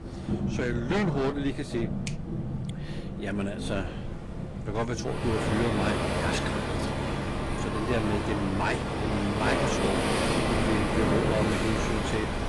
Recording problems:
garbled, watery; slightly; nothing above 10.5 kHz
rain or running water; very loud; throughout; 2 dB above the speech
wind noise on the microphone; occasional gusts; 20 dB below the speech

